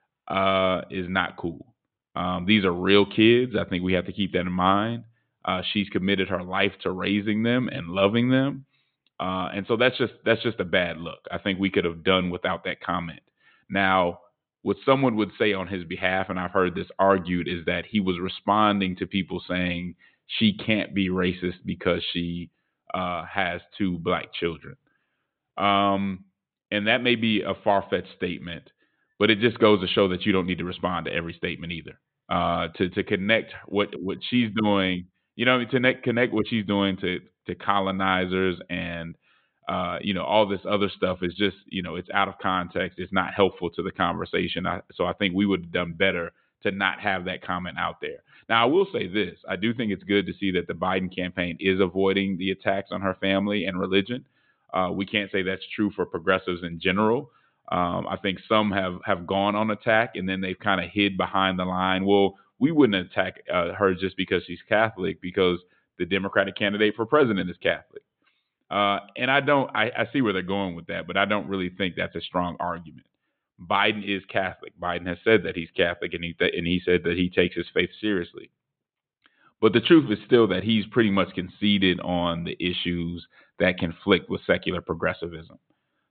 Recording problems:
high frequencies cut off; severe; nothing above 4 kHz

